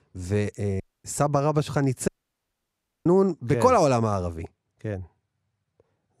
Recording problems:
audio cutting out; at 1 s and at 2 s for 1 s

